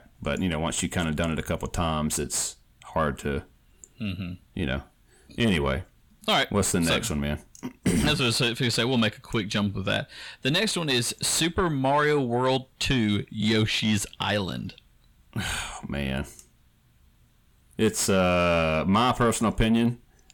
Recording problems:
distortion; slight; 10 dB below the speech

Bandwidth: 18 kHz